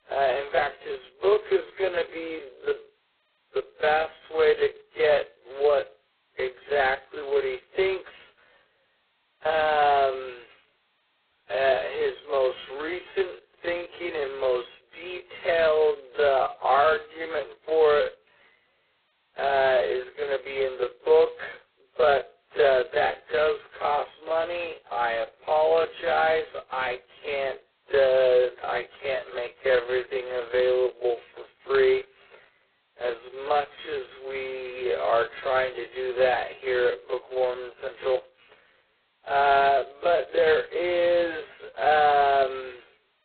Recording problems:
phone-call audio; poor line; nothing above 4 kHz
garbled, watery; badly
wrong speed, natural pitch; too slow; 0.5 times normal speed

